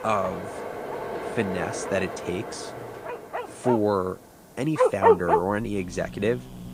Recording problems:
garbled, watery; slightly; nothing above 9 kHz
animal sounds; very loud; throughout; 3 dB above the speech
train or aircraft noise; loud; throughout; 7 dB below the speech
background music; faint; until 3.5 s; 25 dB below the speech
hiss; faint; throughout; 25 dB below the speech

